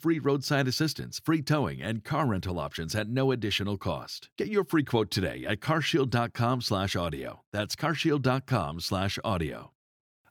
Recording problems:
none

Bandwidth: 18.5 kHz